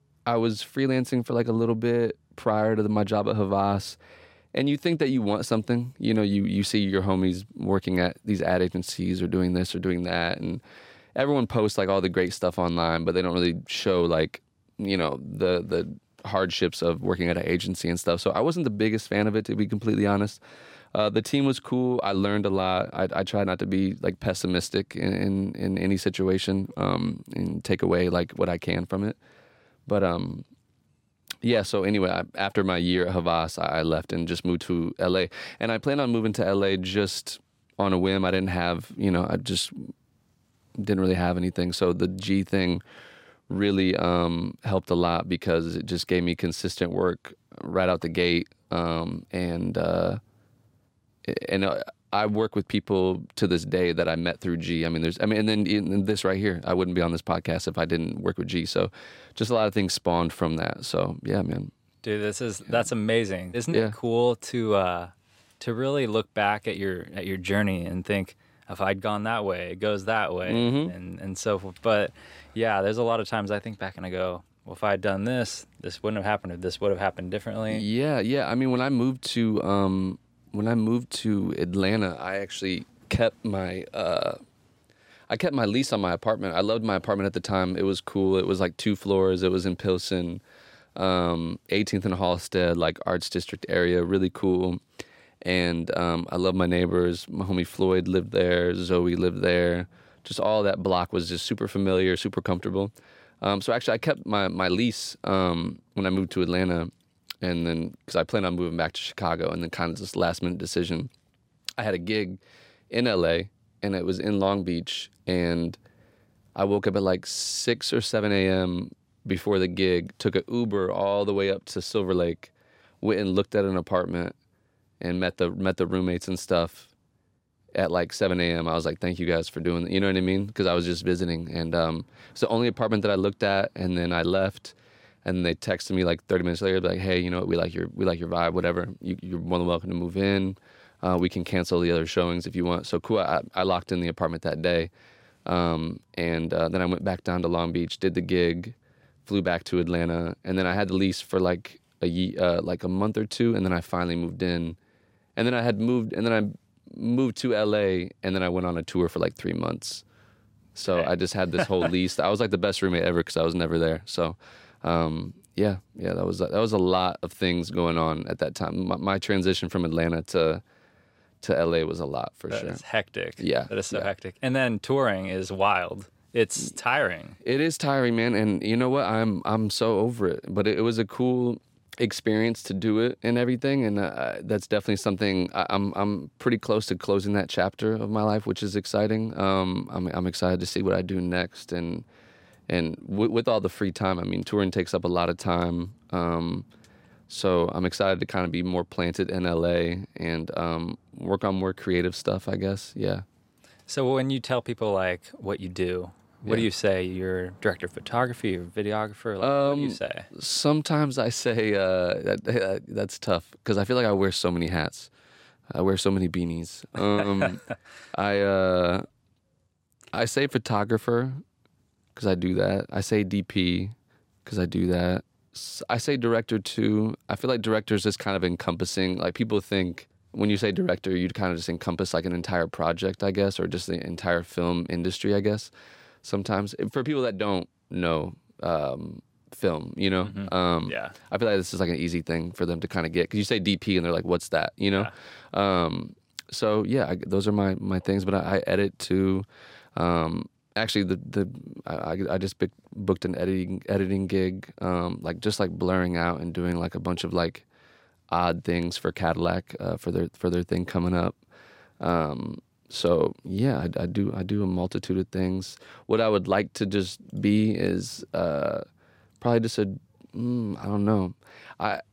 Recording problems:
none

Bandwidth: 16 kHz